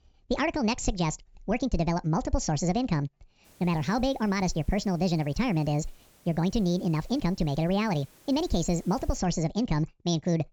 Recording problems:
wrong speed and pitch; too fast and too high; 1.6 times normal speed
high frequencies cut off; noticeable; nothing above 8 kHz
hiss; faint; from 3.5 to 9 s; 30 dB below the speech

